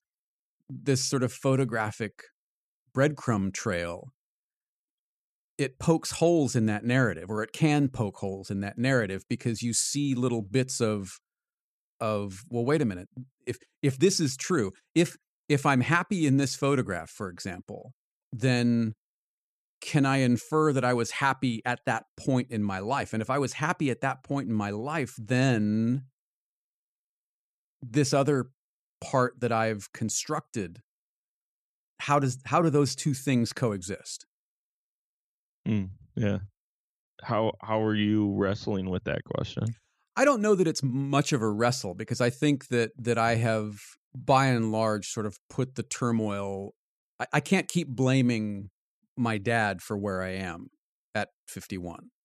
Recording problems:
none

